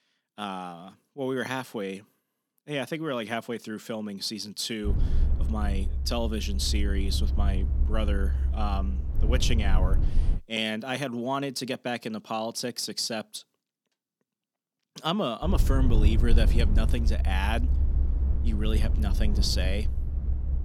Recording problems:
low rumble; noticeable; from 5 to 10 s and from 15 s on; 10 dB below the speech

